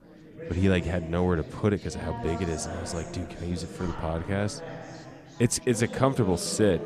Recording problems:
chatter from many people; noticeable; throughout; 10 dB below the speech

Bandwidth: 14.5 kHz